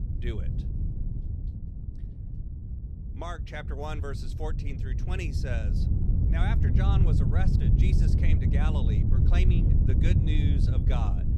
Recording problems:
wind noise on the microphone; heavy; 1 dB below the speech

